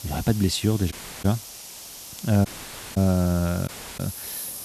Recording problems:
hiss; noticeable; throughout; 10 dB below the speech
audio cutting out; at 1 s, at 2.5 s for 0.5 s and at 3.5 s

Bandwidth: 13.5 kHz